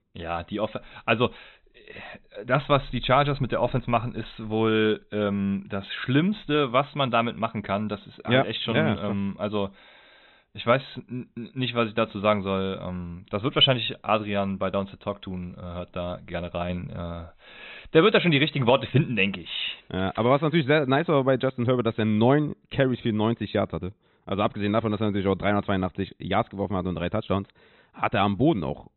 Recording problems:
high frequencies cut off; severe; nothing above 4 kHz

